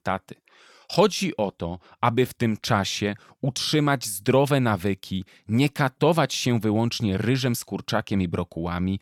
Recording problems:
none

